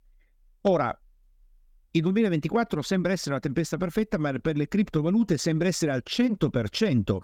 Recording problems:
none

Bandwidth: 17.5 kHz